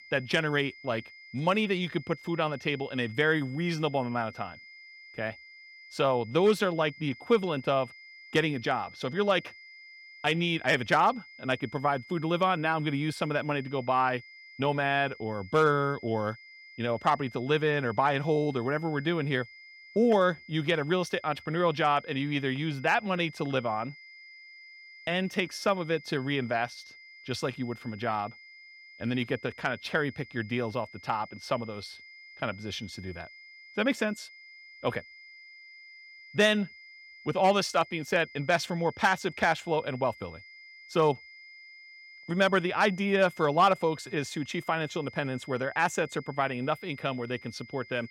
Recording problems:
high-pitched whine; noticeable; throughout; 2 kHz, 20 dB below the speech

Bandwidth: 16.5 kHz